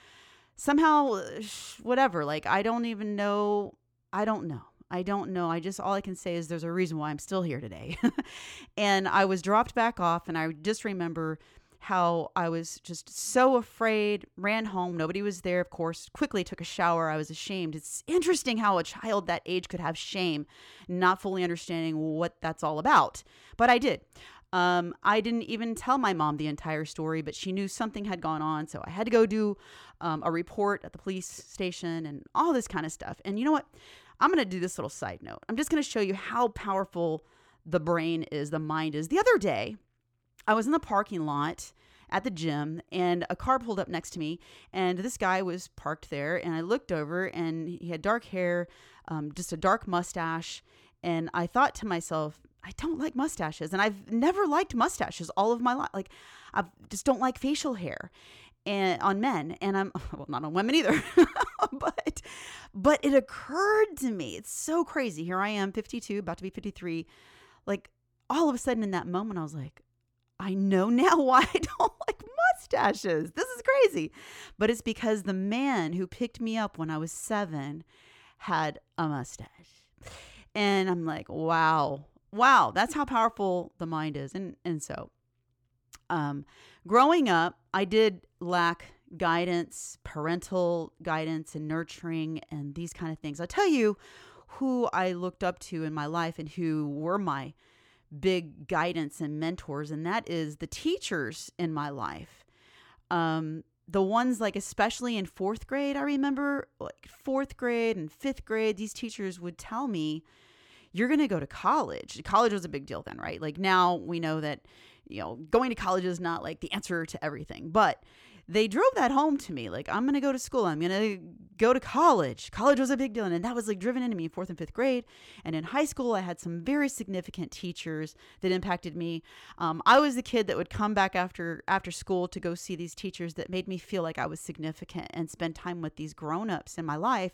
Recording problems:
none

